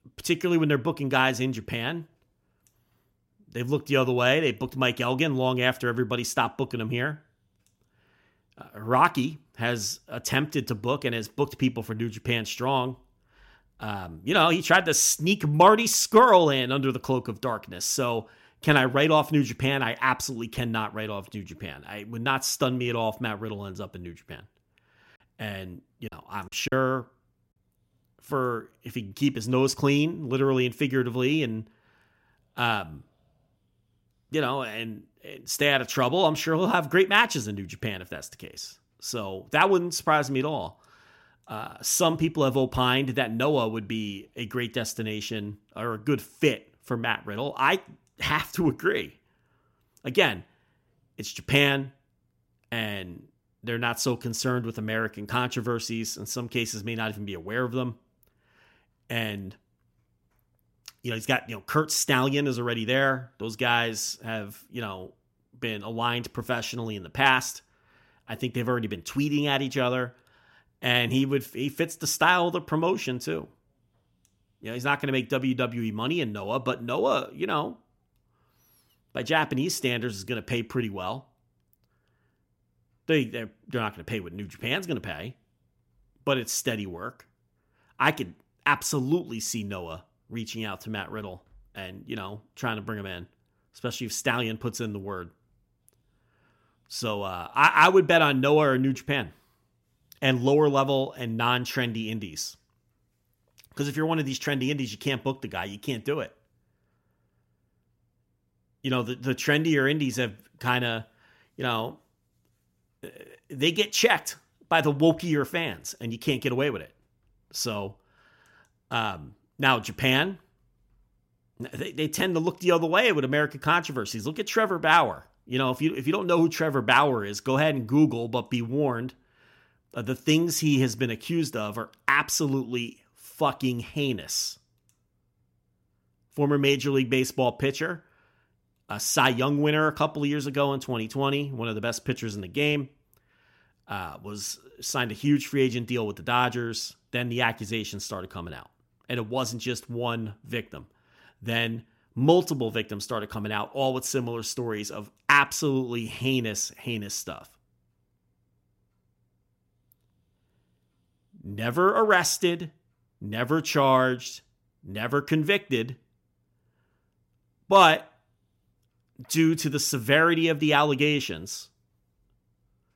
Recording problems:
choppy; very; at 26 s; 9% of the speech affected

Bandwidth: 16 kHz